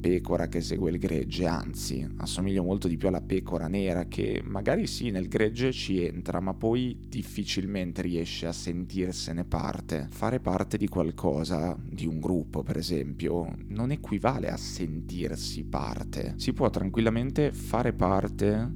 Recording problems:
electrical hum; noticeable; throughout; 50 Hz, 20 dB below the speech

